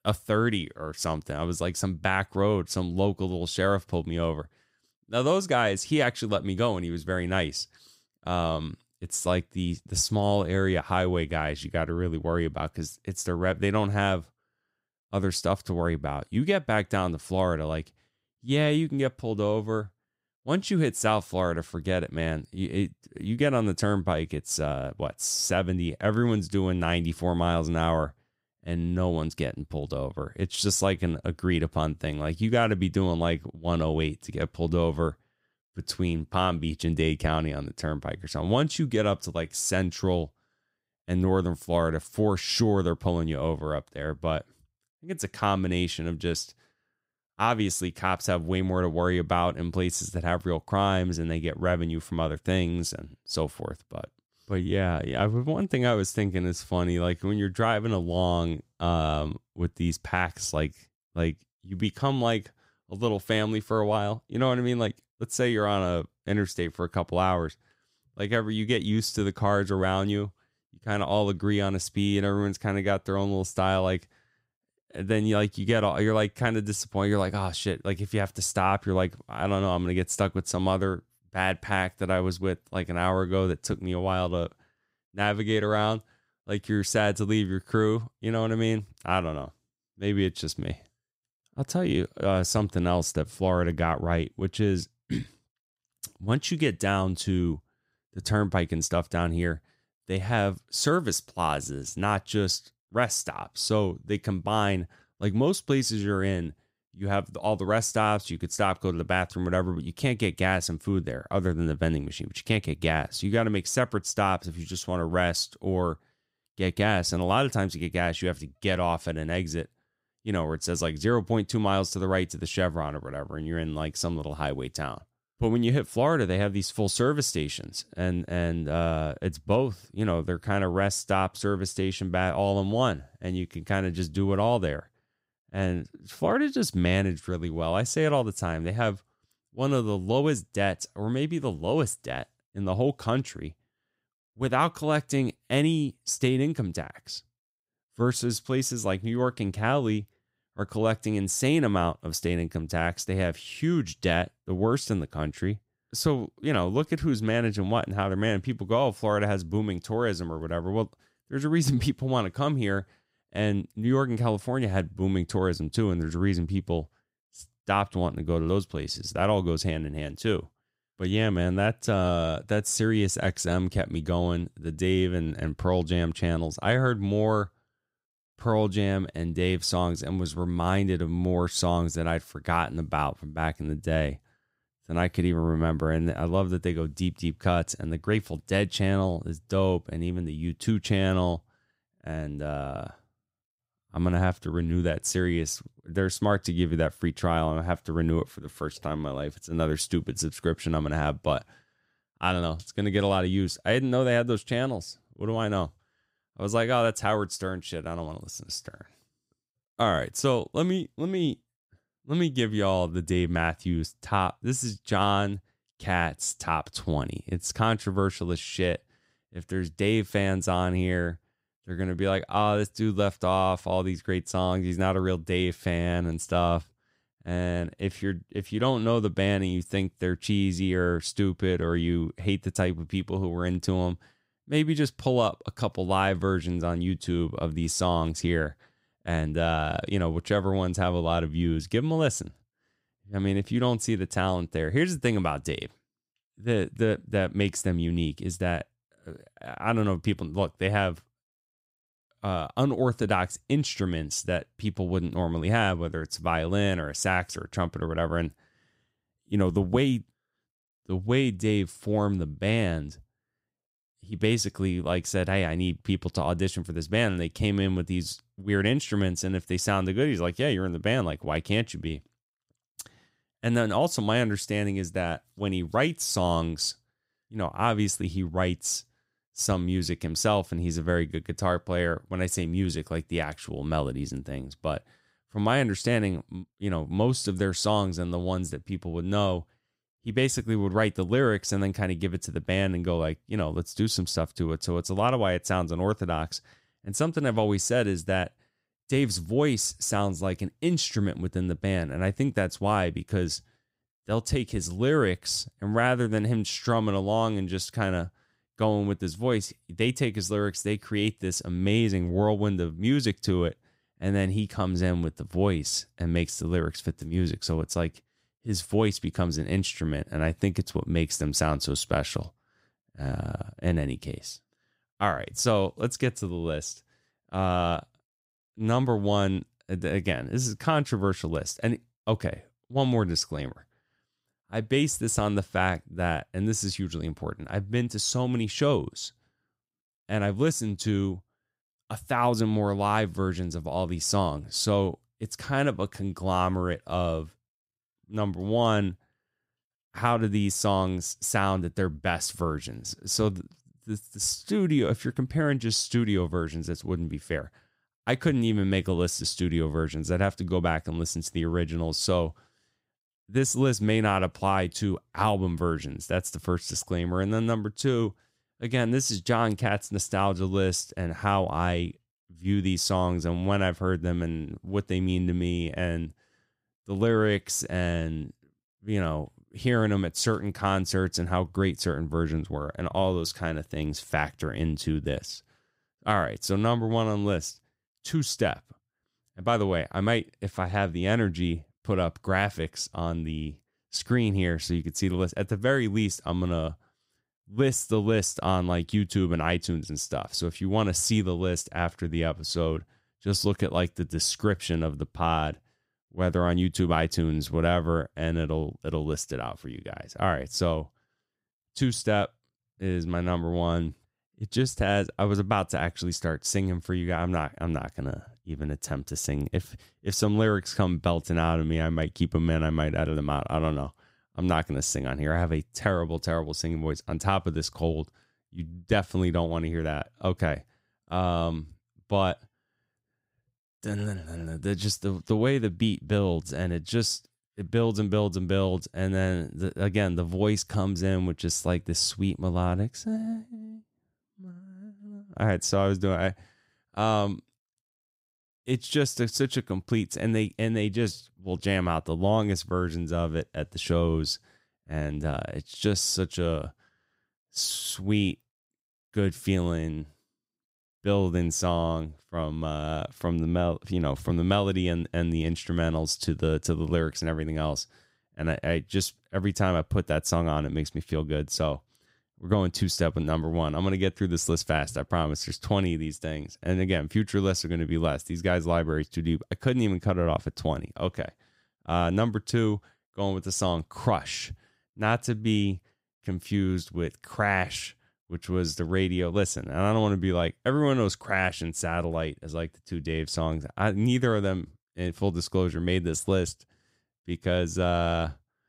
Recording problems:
none

